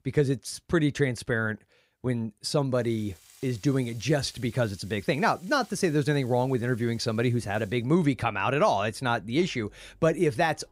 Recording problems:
household noises; faint; from 3 s on; 25 dB below the speech

